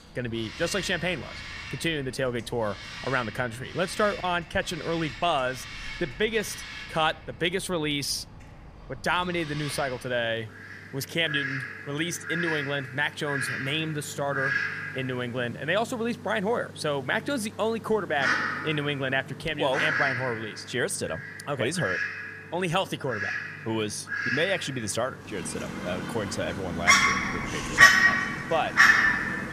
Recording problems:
animal sounds; very loud; throughout; 3 dB above the speech

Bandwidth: 15 kHz